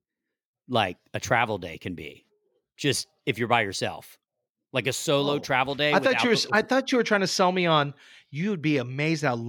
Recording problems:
abrupt cut into speech; at the end

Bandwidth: 17.5 kHz